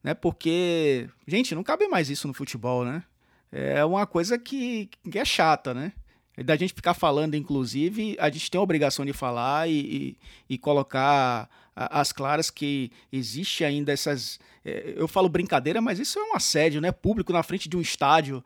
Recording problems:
none

